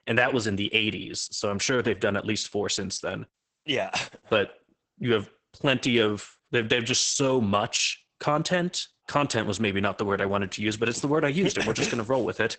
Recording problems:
garbled, watery; badly; nothing above 8 kHz

